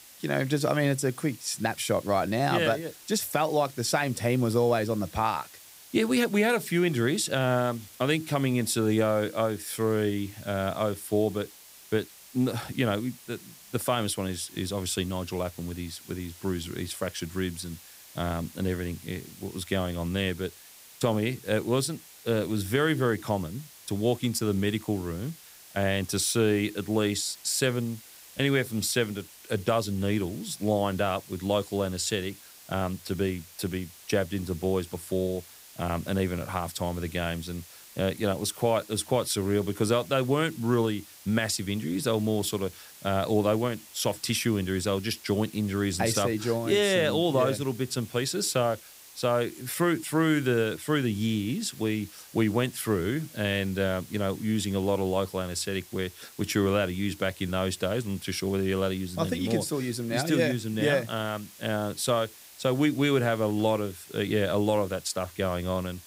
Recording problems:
hiss; noticeable; throughout; 20 dB below the speech

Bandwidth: 15.5 kHz